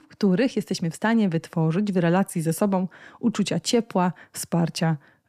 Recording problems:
none

